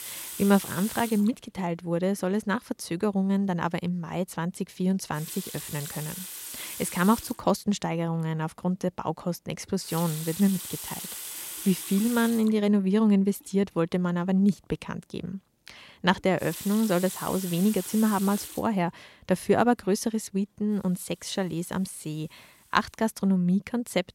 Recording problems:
household noises; loud; throughout; 9 dB below the speech

